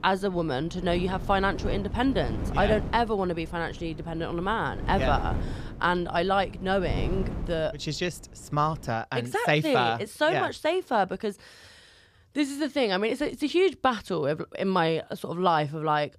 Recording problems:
wind noise on the microphone; occasional gusts; until 9 s; 15 dB below the speech

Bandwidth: 14.5 kHz